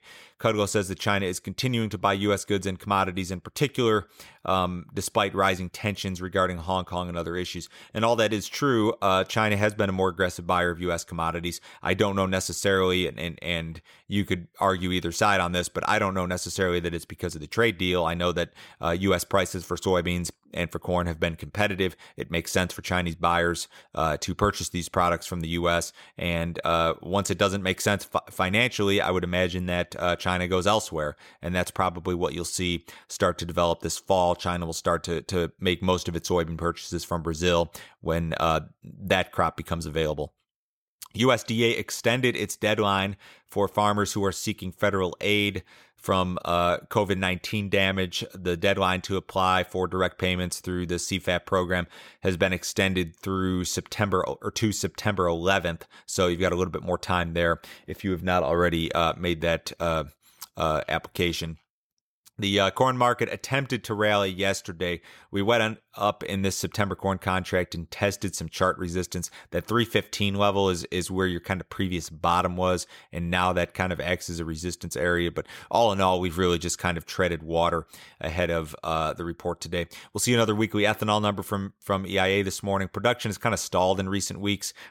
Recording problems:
none

